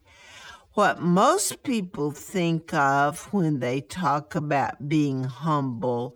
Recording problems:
wrong speed, natural pitch; too slow; 0.6 times normal speed

